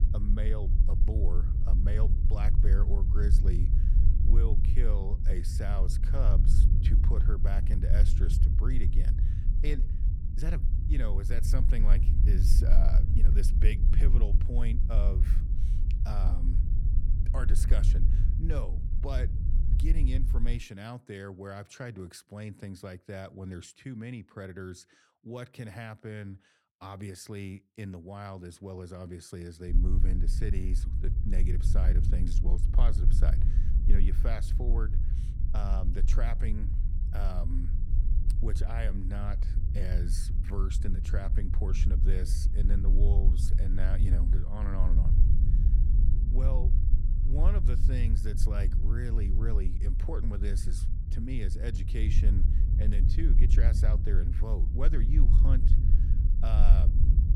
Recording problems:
low rumble; loud; until 21 s and from 30 s on; 4 dB below the speech

